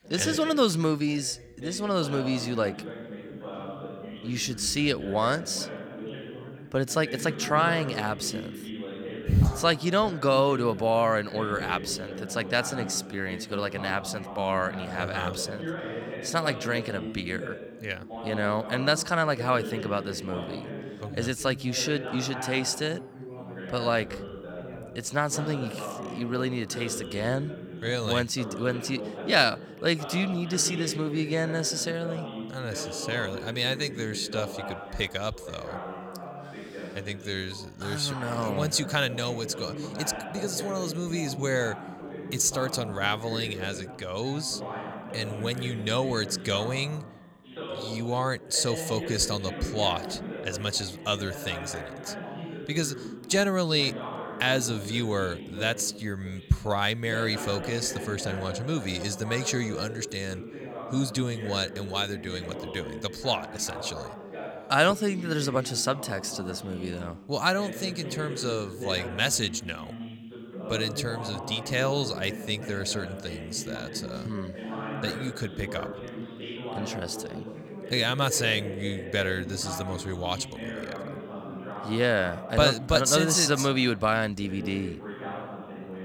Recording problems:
background chatter; noticeable; throughout; 2 voices, 10 dB below the speech

